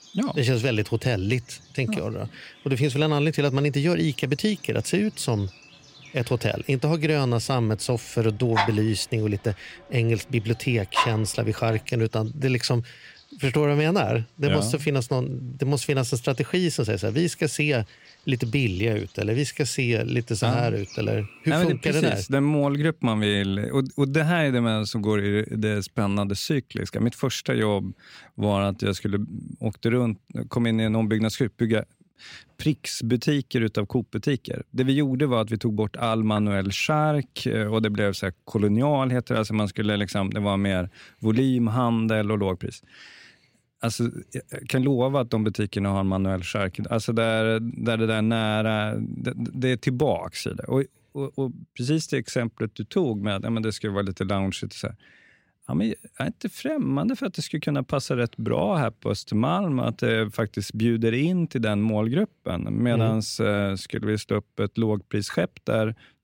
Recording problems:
animal sounds; noticeable; until 22 s; 10 dB below the speech

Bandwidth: 16 kHz